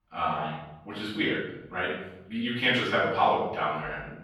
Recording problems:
off-mic speech; far
room echo; noticeable; dies away in 0.8 s

